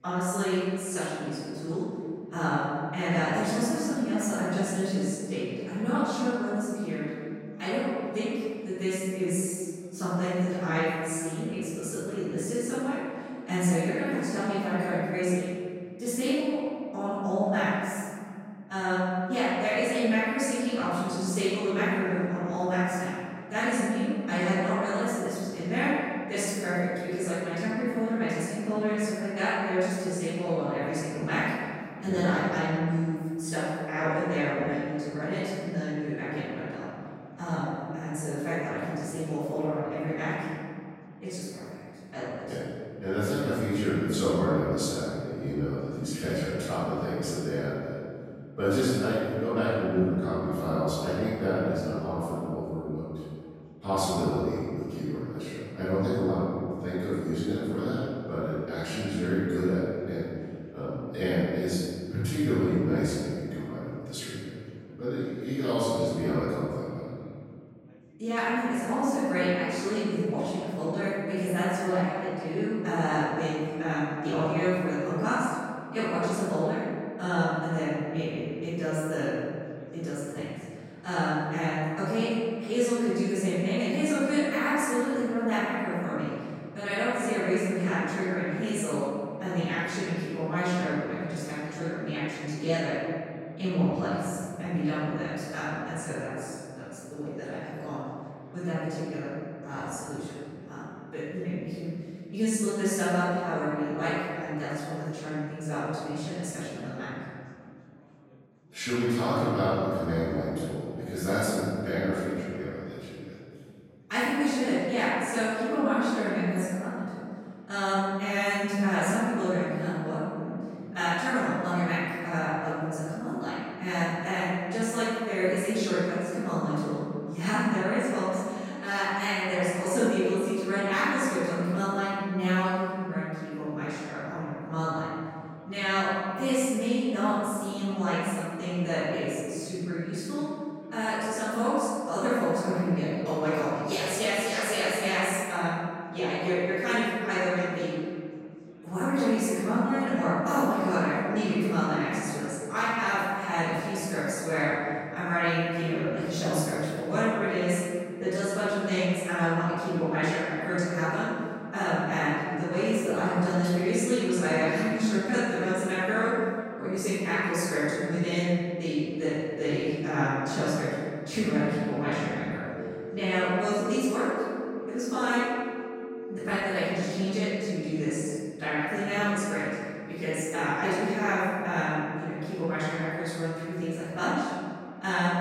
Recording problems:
room echo; strong; dies away in 2.3 s
off-mic speech; far
background chatter; faint; throughout; 4 voices, 30 dB below the speech
phone ringing; noticeable; from 2:52 to 2:57; peak 9 dB below the speech

